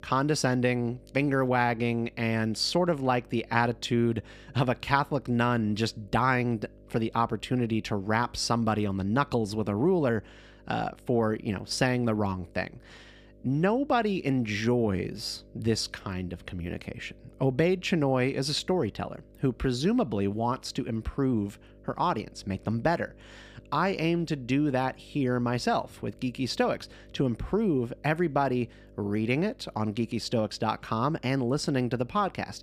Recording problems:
electrical hum; faint; throughout; 50 Hz, 30 dB below the speech

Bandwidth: 15 kHz